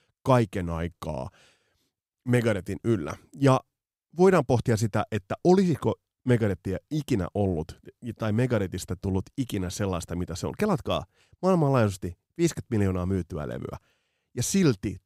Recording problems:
none

